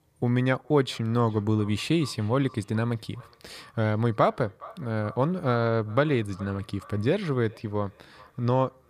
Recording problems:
echo of what is said; faint; throughout; 420 ms later, 25 dB below the speech

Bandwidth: 15 kHz